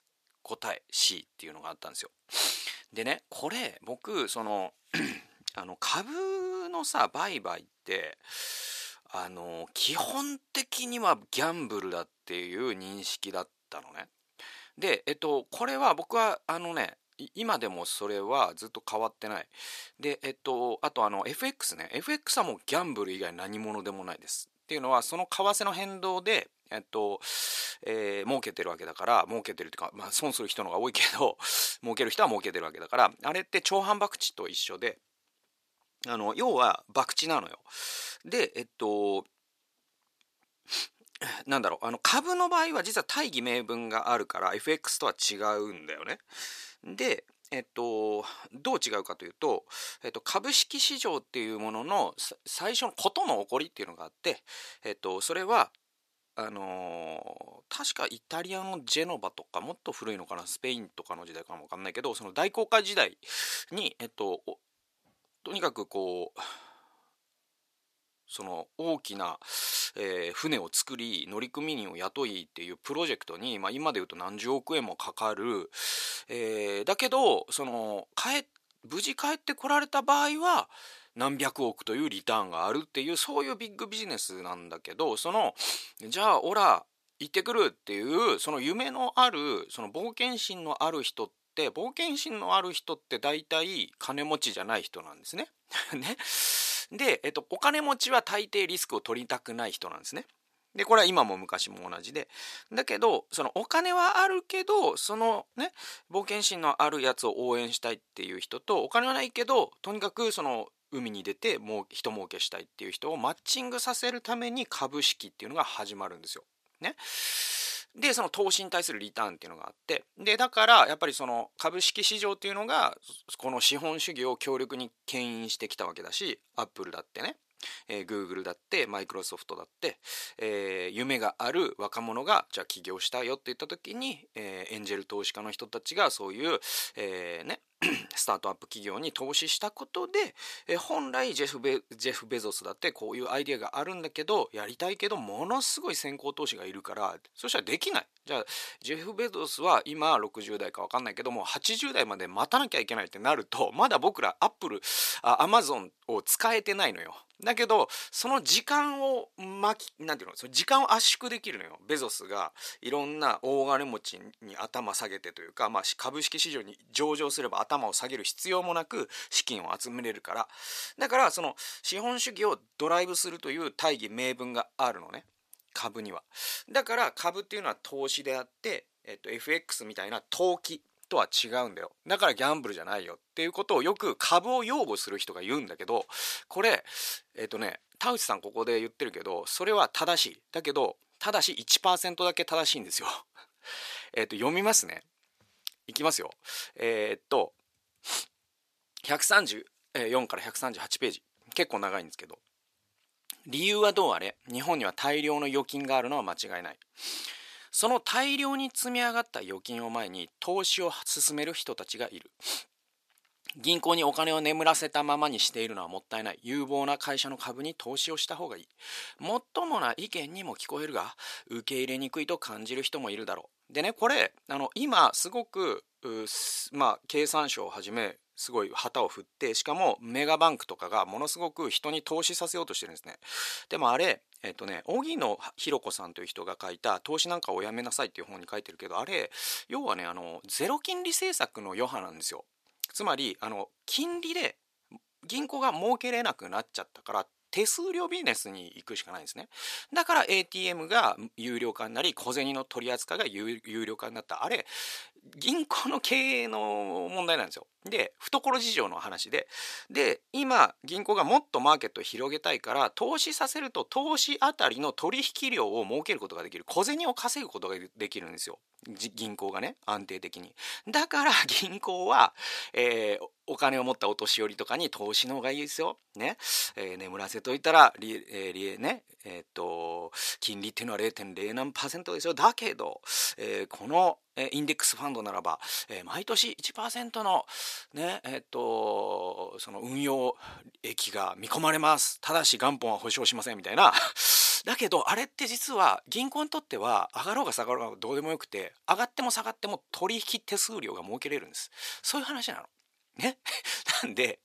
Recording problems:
thin; somewhat; fading below 550 Hz

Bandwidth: 14.5 kHz